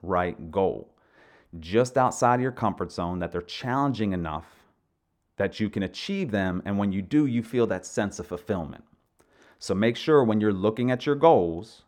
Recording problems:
muffled; slightly; fading above 2.5 kHz

